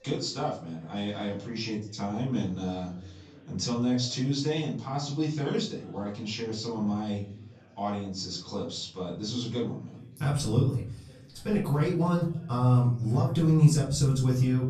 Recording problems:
off-mic speech; far
room echo; slight; dies away in 0.5 s
chatter from many people; faint; throughout; 25 dB below the speech

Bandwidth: 14.5 kHz